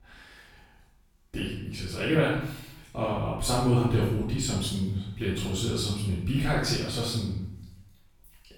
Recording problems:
off-mic speech; far
room echo; noticeable; dies away in 0.7 s

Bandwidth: 18 kHz